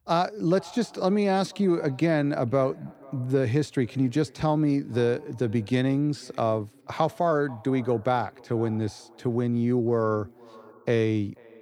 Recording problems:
echo of what is said; faint; throughout; 490 ms later, 25 dB below the speech

